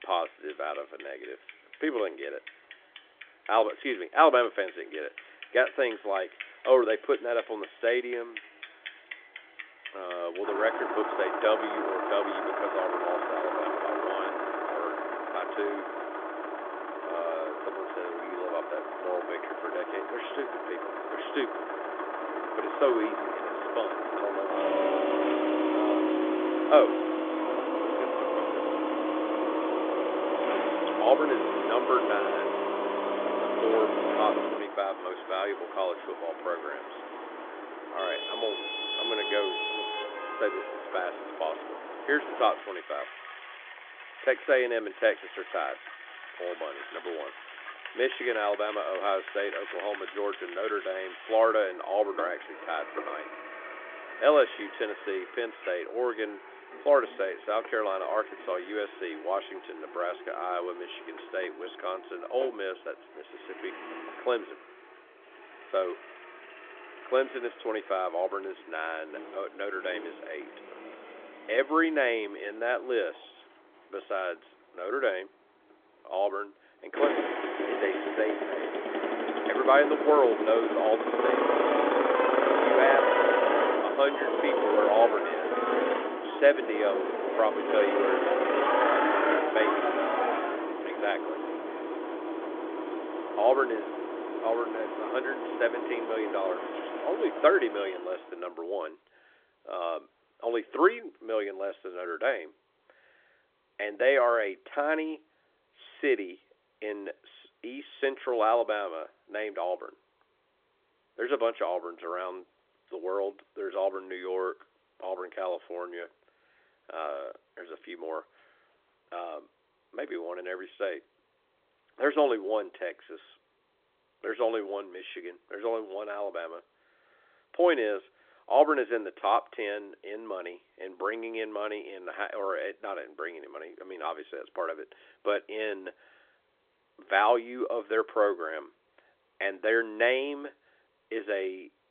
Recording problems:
phone-call audio; nothing above 3.5 kHz
traffic noise; loud; until 1:38; 1 dB below the speech

